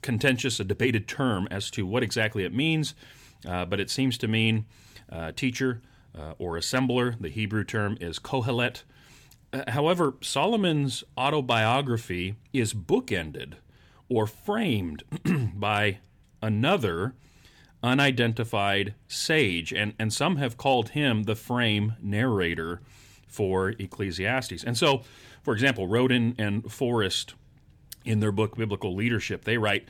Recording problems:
none

